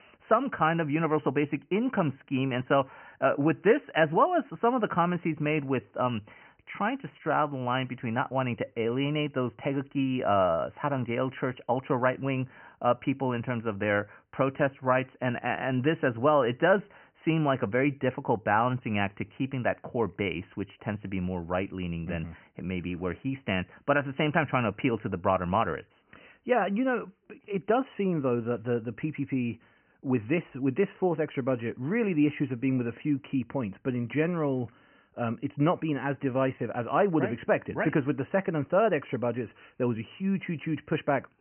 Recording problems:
high frequencies cut off; severe; nothing above 3 kHz

